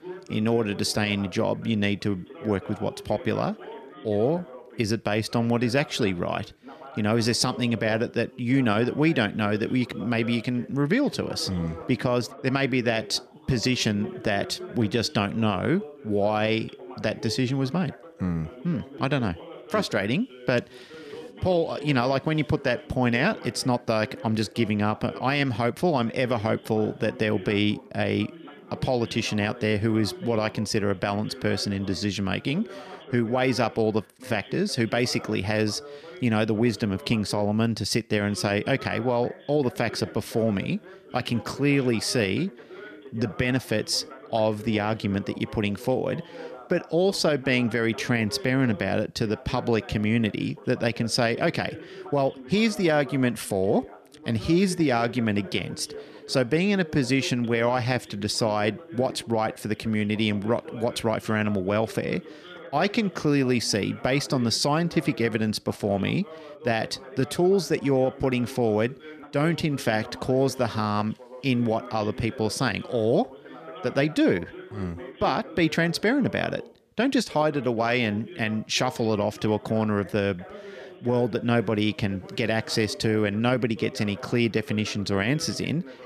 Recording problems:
background chatter; noticeable; throughout; 2 voices, 15 dB below the speech

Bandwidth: 14.5 kHz